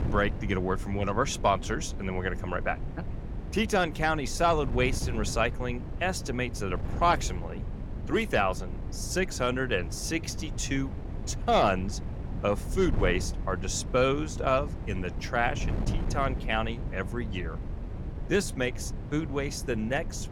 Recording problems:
wind noise on the microphone; occasional gusts; 15 dB below the speech

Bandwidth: 17 kHz